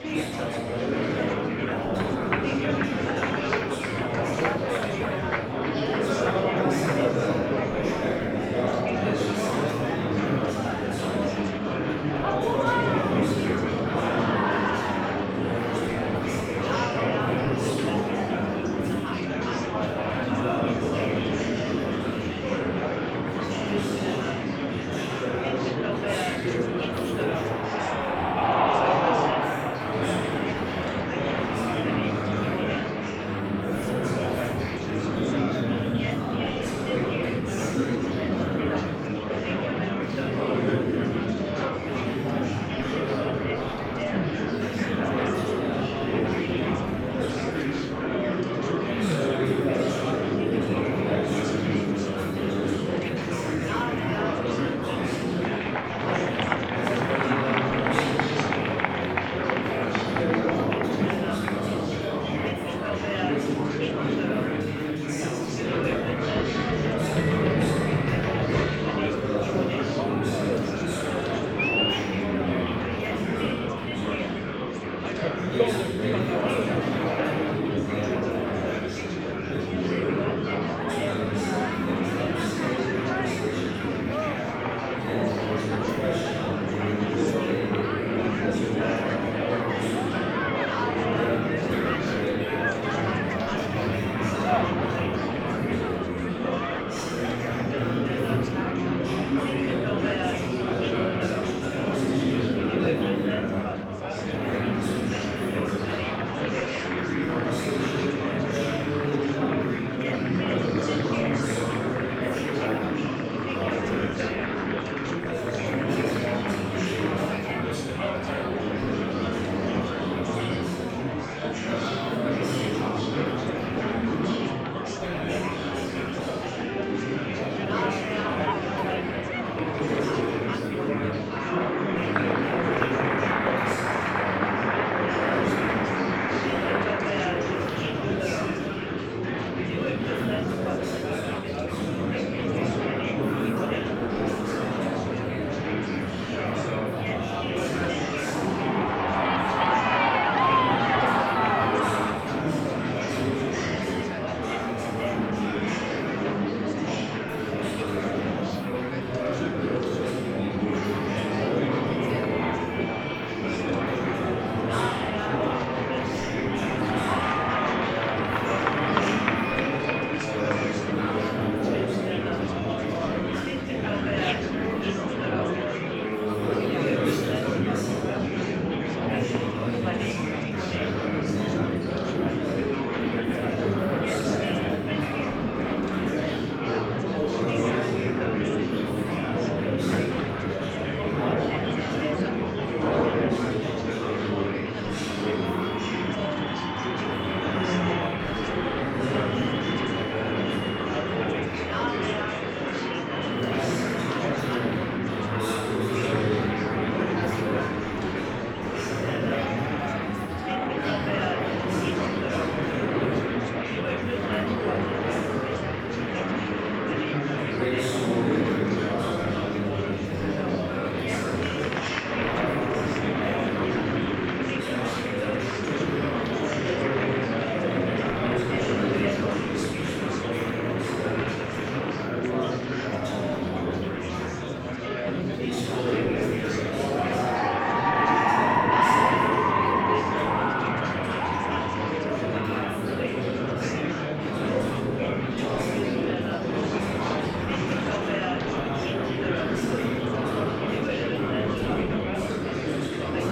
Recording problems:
room echo; strong; dies away in 3 s
off-mic speech; far
murmuring crowd; very loud; throughout; 5 dB above the speech

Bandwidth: 18 kHz